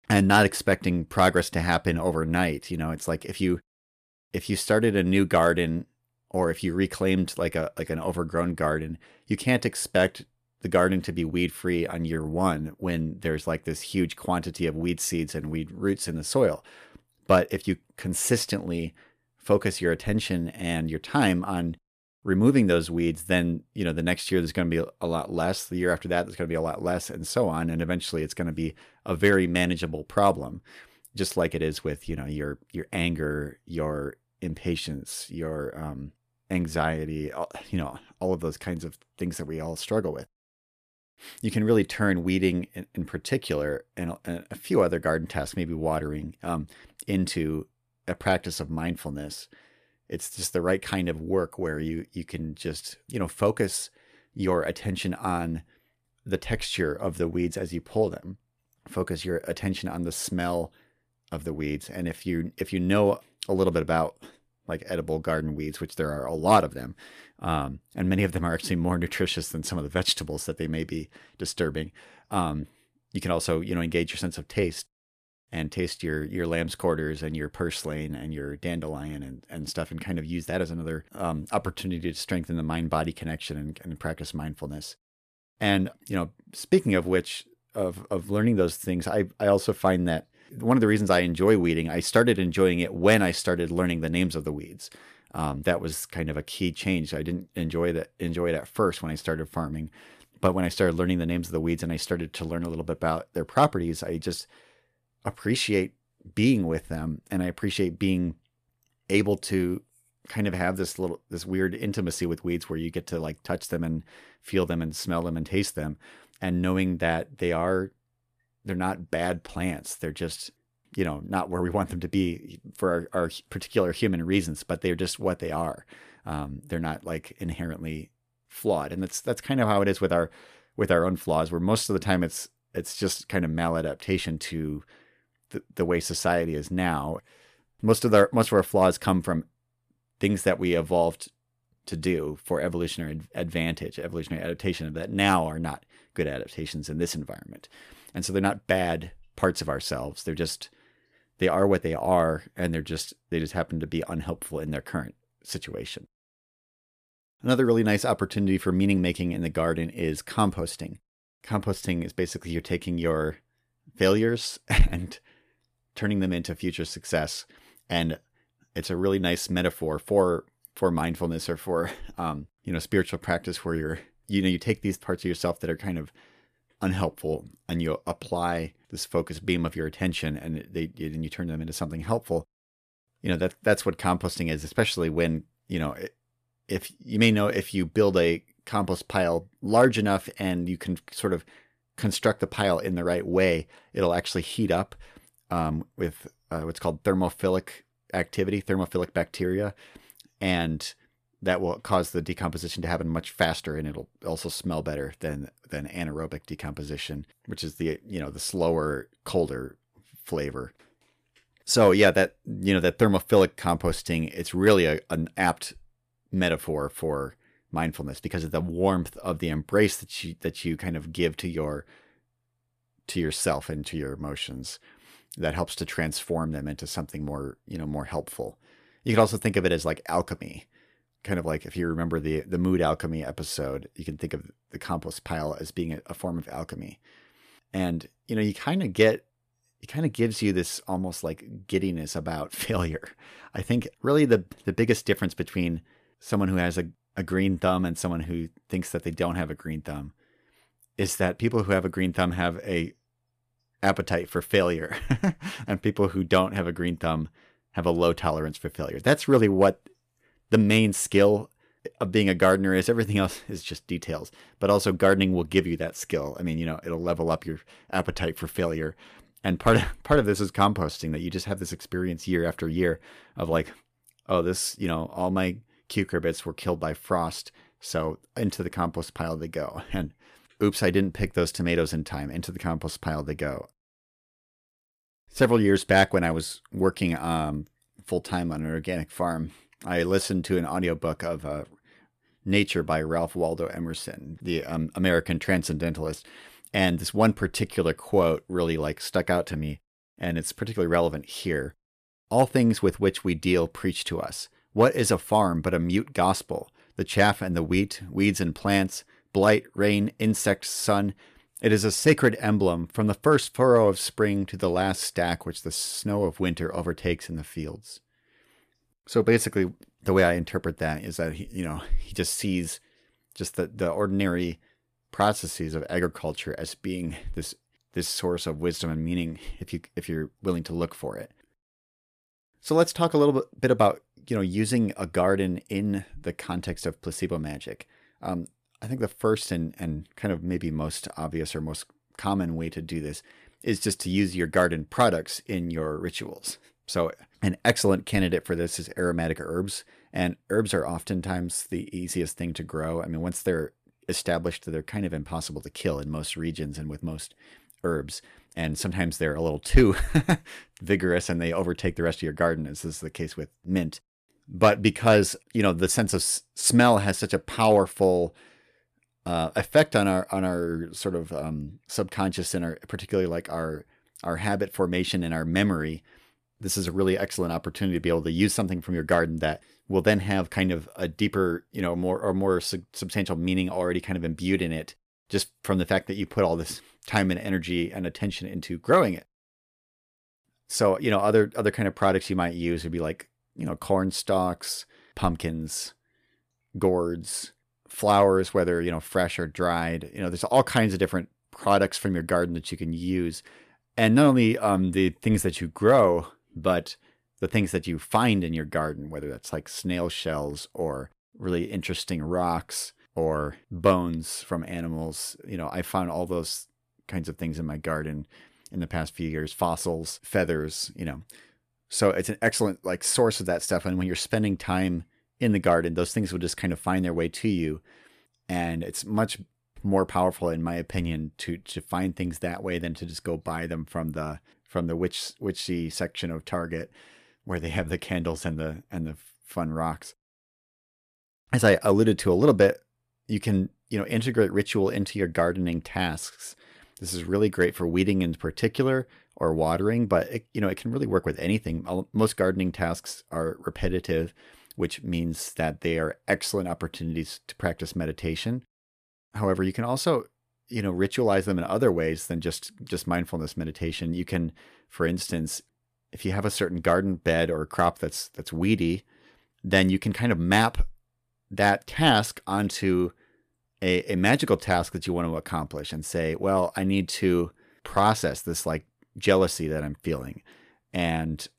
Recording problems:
none

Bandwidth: 14.5 kHz